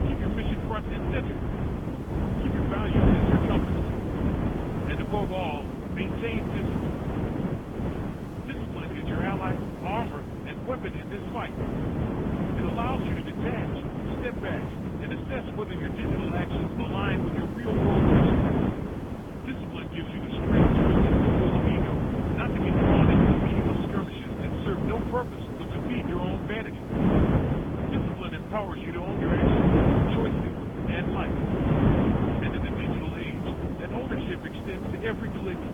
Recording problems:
high frequencies cut off; severe; nothing above 3.5 kHz
garbled, watery; slightly
wind noise on the microphone; heavy; 4 dB above the speech
hiss; noticeable; throughout; 20 dB below the speech

